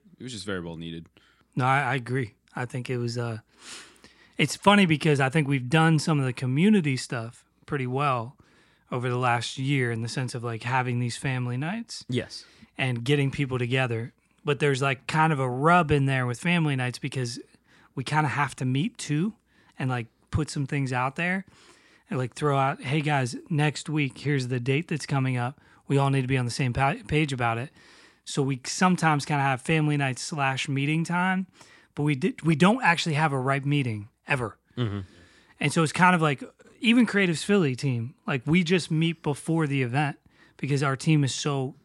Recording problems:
none

